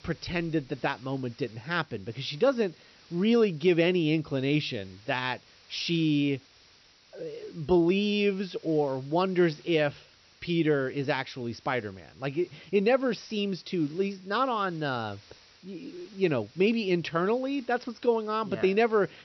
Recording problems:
high frequencies cut off; noticeable; nothing above 6 kHz
hiss; faint; throughout; 25 dB below the speech

